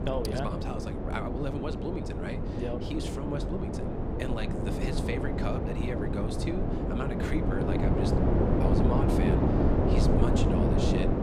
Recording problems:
wind noise on the microphone; heavy; 4 dB above the speech

